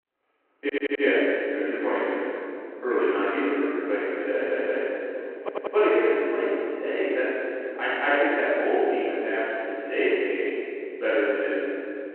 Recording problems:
room echo; strong; dies away in 2.5 s
off-mic speech; far
phone-call audio
audio stuttering; at 0.5 s, at 4.5 s and at 5.5 s

